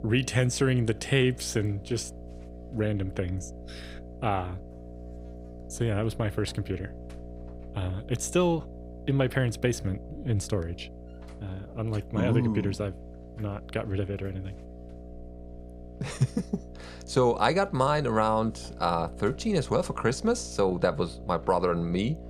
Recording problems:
electrical hum; noticeable; throughout; 60 Hz, 20 dB below the speech

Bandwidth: 15.5 kHz